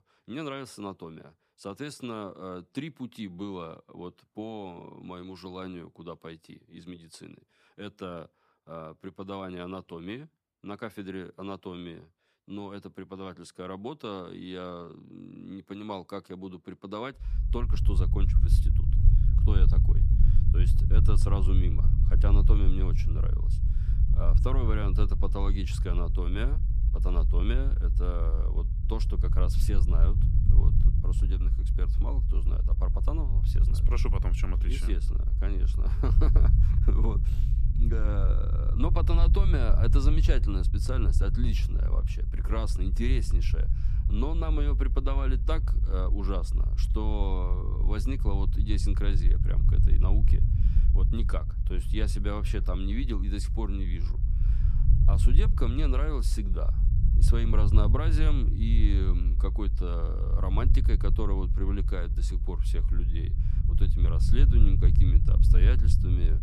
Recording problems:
low rumble; loud; from 17 s on; 6 dB below the speech

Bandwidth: 14.5 kHz